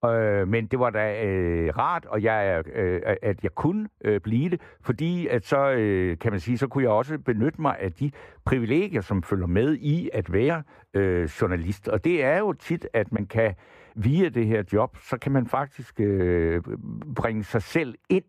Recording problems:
muffled; very; fading above 3 kHz

